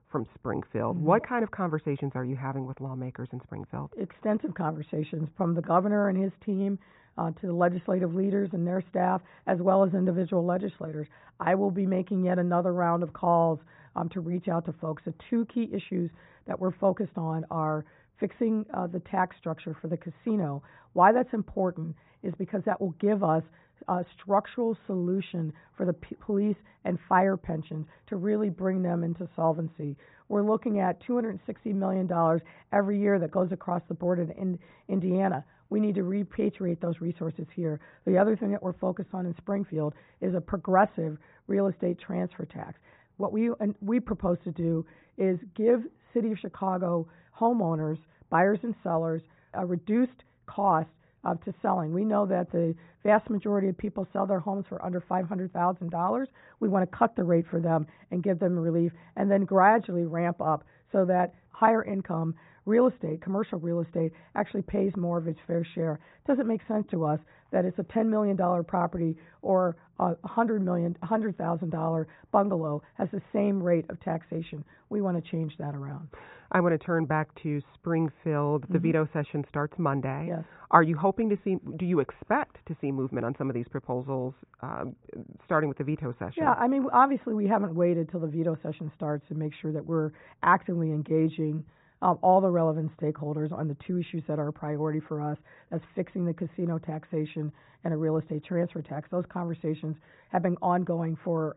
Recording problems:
high frequencies cut off; severe; nothing above 4 kHz
muffled; very slightly; fading above 1.5 kHz

